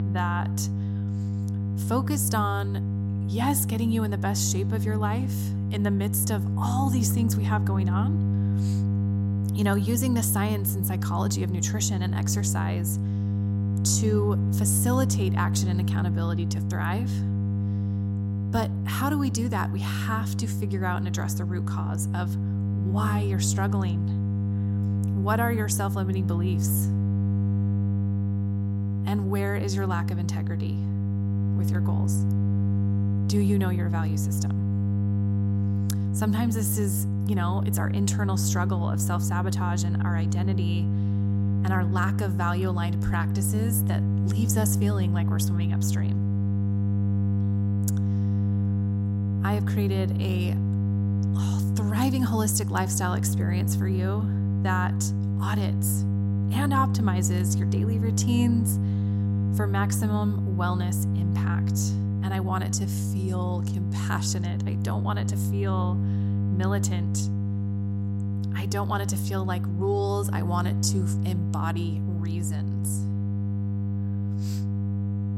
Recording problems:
electrical hum; loud; throughout; 50 Hz, 6 dB below the speech

